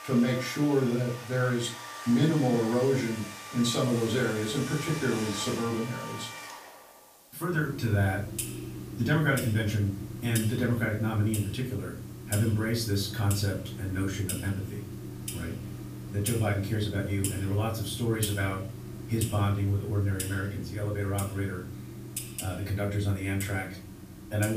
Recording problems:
off-mic speech; far
room echo; slight; dies away in 0.3 s
household noises; loud; throughout; 9 dB below the speech
hiss; faint; throughout; 25 dB below the speech
abrupt cut into speech; at the end

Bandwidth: 15 kHz